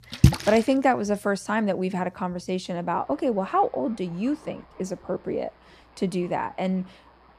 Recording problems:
rain or running water; very loud; throughout; 3 dB above the speech

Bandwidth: 14.5 kHz